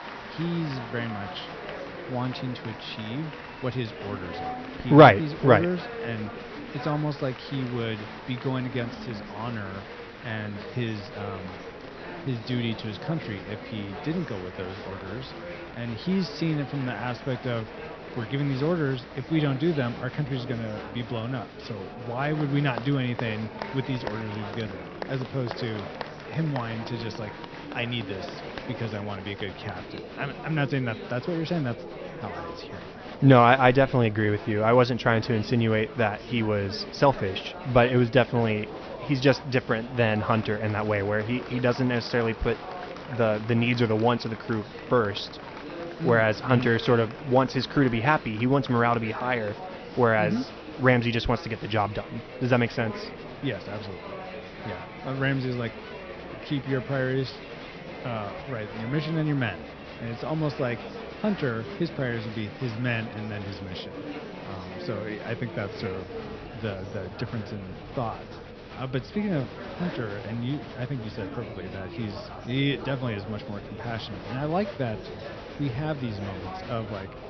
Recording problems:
high frequencies cut off; noticeable; nothing above 6 kHz
murmuring crowd; noticeable; throughout; 10 dB below the speech

